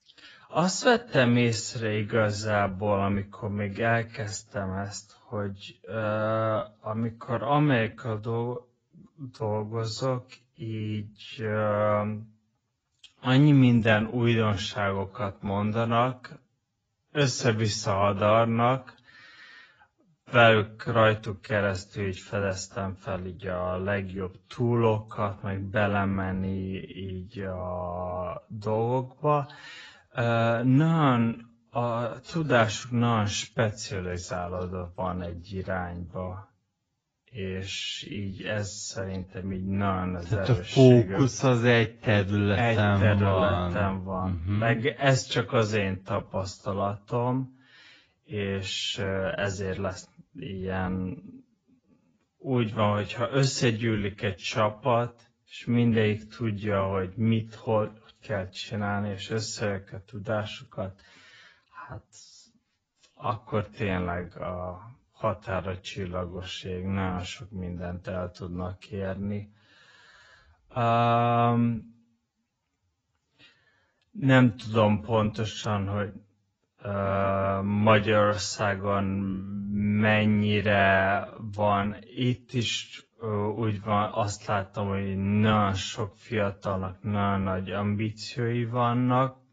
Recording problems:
garbled, watery; badly; nothing above 7.5 kHz
wrong speed, natural pitch; too slow; 0.5 times normal speed

